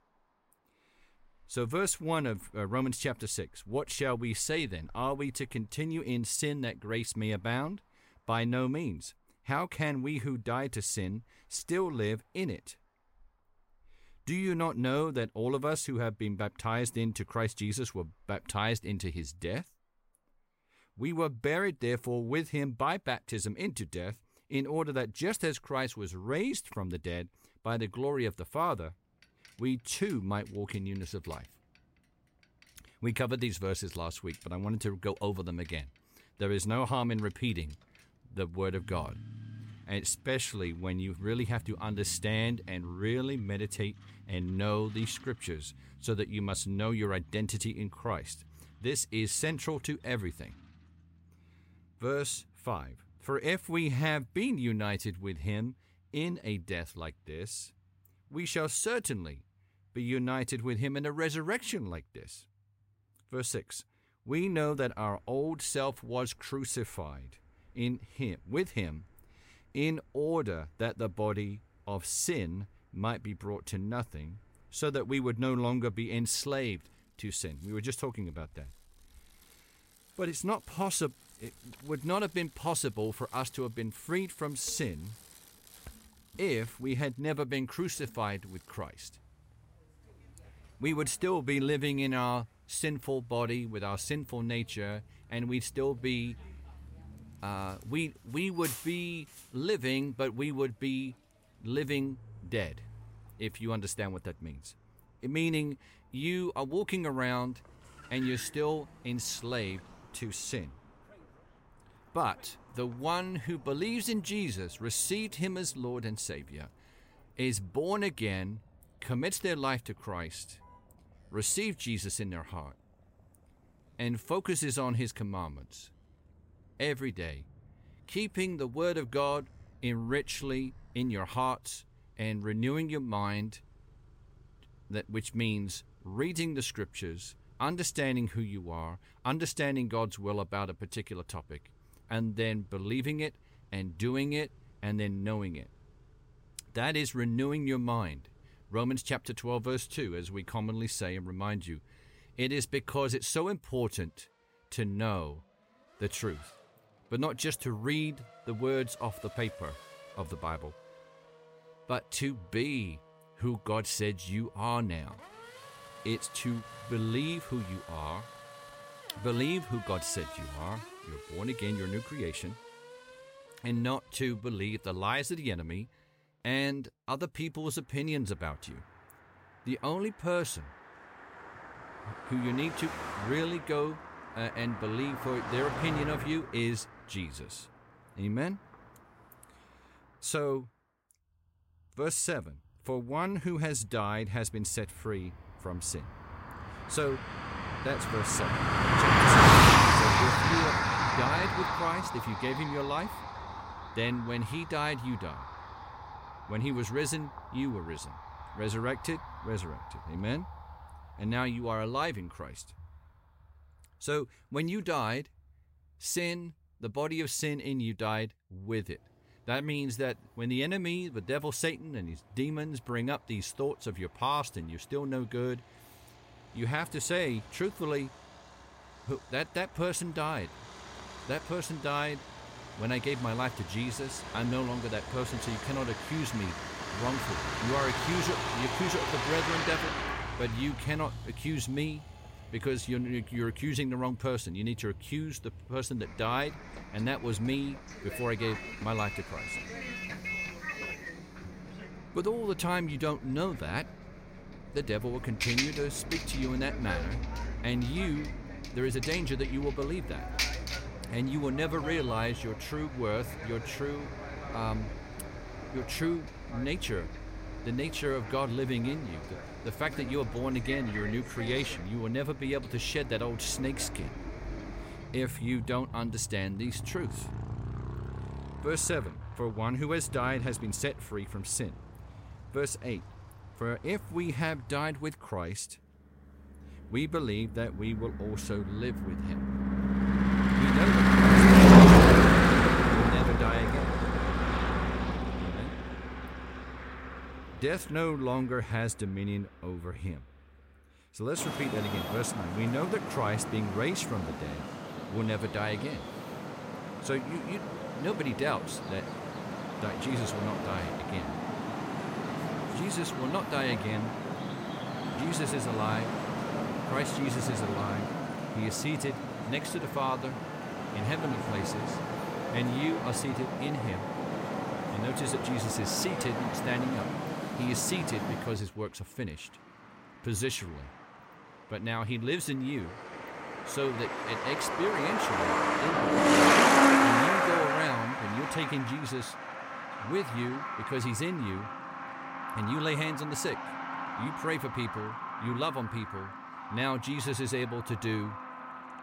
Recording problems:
traffic noise; very loud; throughout; 5 dB above the speech

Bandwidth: 16 kHz